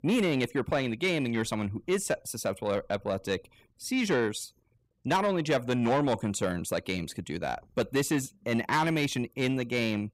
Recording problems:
distortion; slight; 10 dB below the speech

